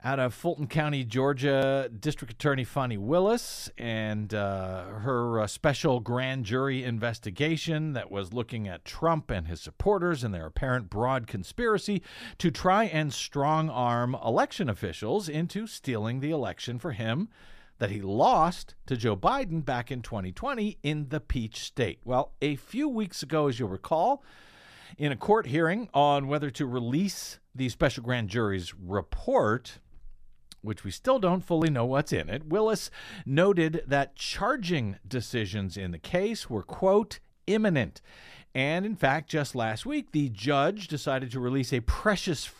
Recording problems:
none

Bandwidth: 14.5 kHz